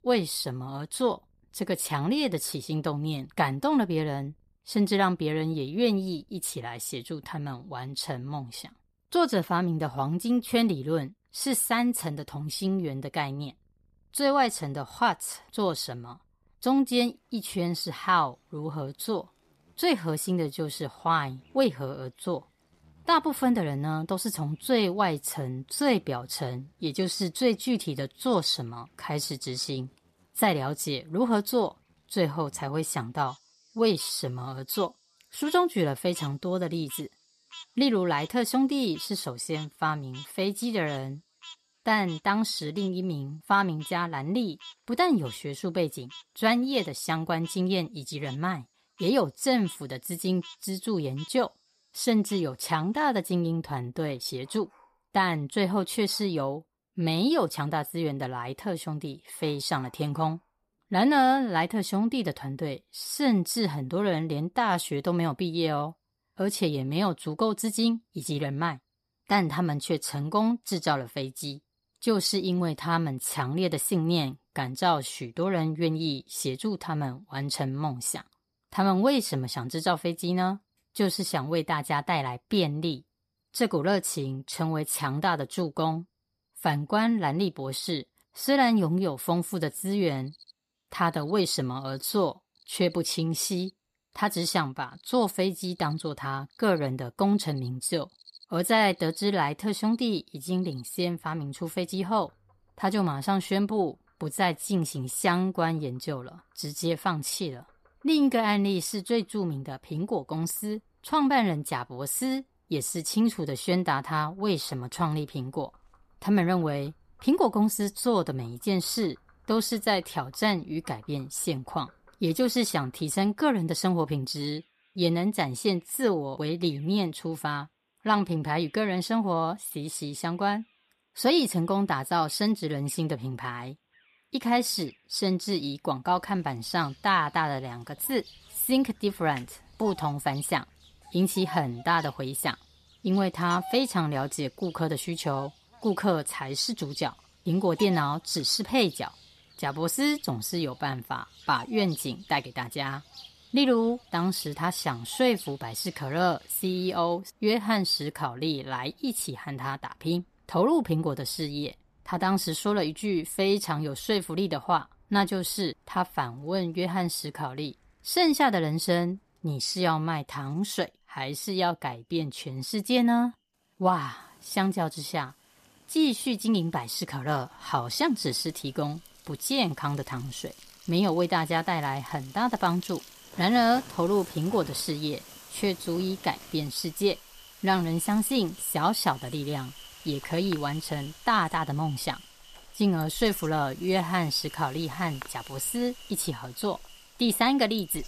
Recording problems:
animal sounds; faint; throughout; 20 dB below the speech

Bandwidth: 14.5 kHz